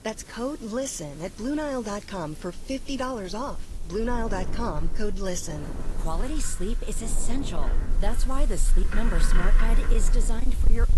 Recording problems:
distortion; slight; 2% of the sound clipped
garbled, watery; slightly; nothing above 11.5 kHz
animal sounds; very loud; throughout; 2 dB above the speech
wind noise on the microphone; occasional gusts; 15 dB below the speech
hiss; noticeable; throughout; 20 dB below the speech

